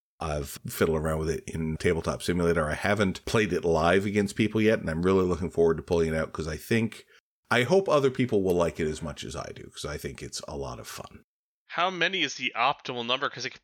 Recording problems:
none

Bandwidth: 18.5 kHz